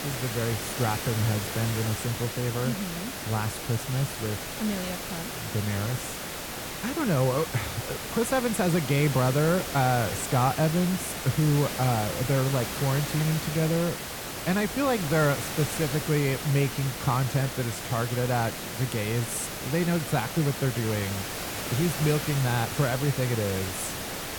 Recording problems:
hiss; loud; throughout; 5 dB below the speech

